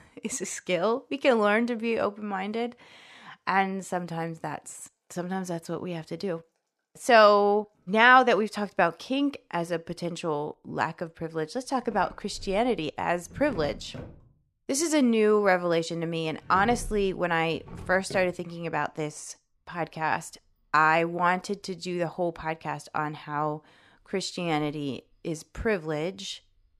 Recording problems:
household noises; noticeable; throughout; 20 dB below the speech

